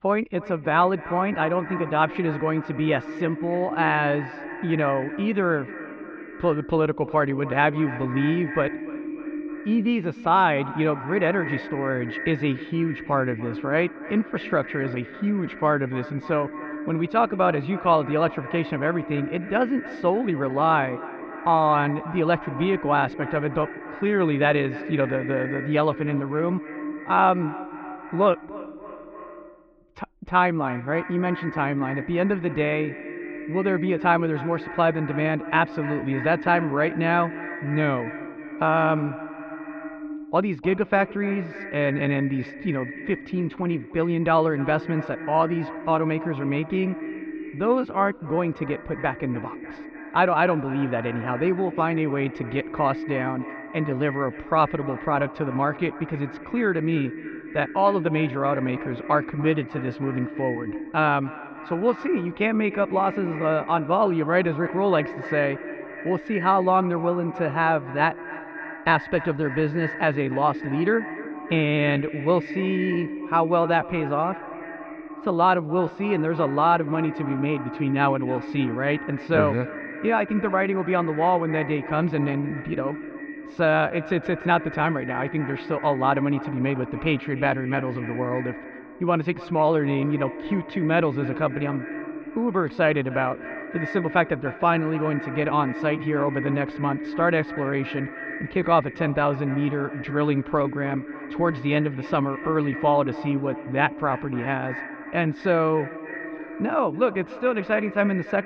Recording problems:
echo of what is said; strong; throughout; 300 ms later, 10 dB below the speech
muffled; very; fading above 3 kHz

